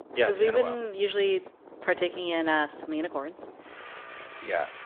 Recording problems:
phone-call audio
traffic noise; noticeable; throughout; 20 dB below the speech

